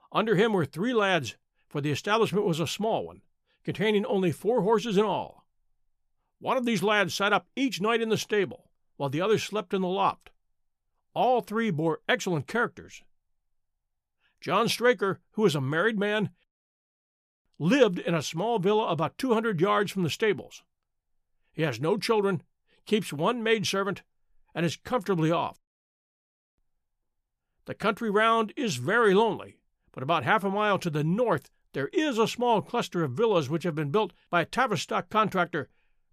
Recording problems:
none

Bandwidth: 14.5 kHz